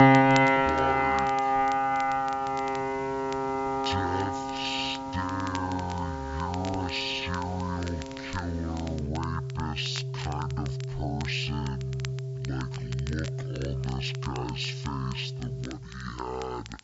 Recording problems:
wrong speed and pitch; too slow and too low; 0.5 times normal speed
high frequencies cut off; noticeable; nothing above 7.5 kHz
background music; very loud; throughout; 4 dB above the speech
crackle, like an old record; noticeable; 15 dB below the speech
hiss; faint; throughout; 30 dB below the speech

